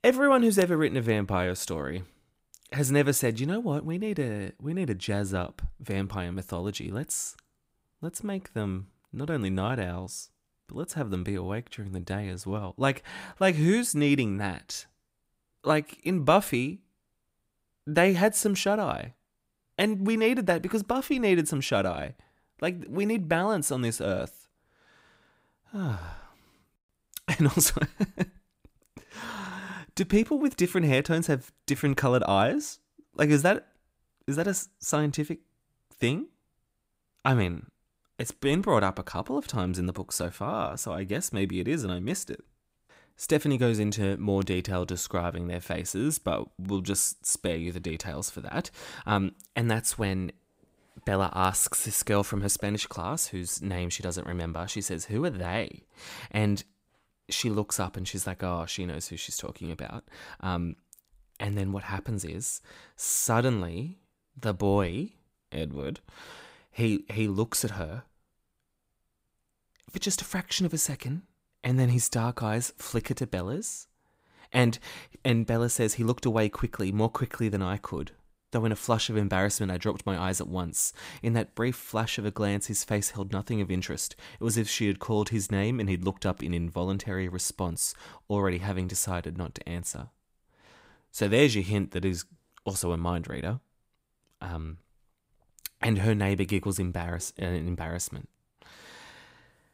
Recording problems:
none

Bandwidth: 15.5 kHz